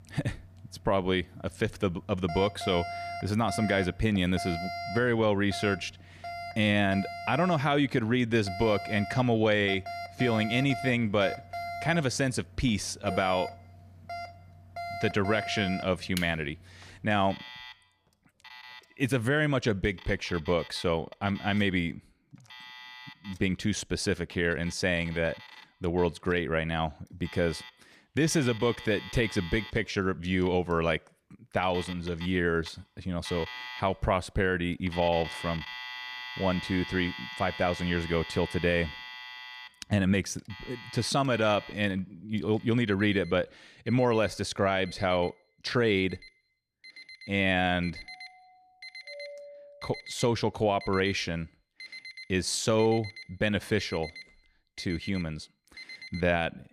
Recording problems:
alarms or sirens; noticeable; throughout; 15 dB below the speech
doorbell; faint; from 48 to 50 s; peak 15 dB below the speech

